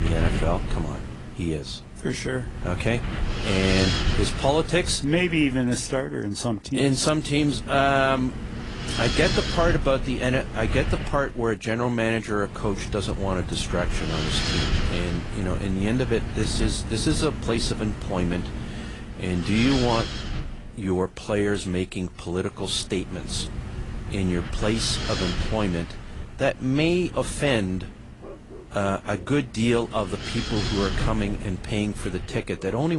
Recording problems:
garbled, watery; slightly
wind noise on the microphone; heavy; 6 dB below the speech
animal sounds; very faint; throughout; 25 dB below the speech
abrupt cut into speech; at the start and the end

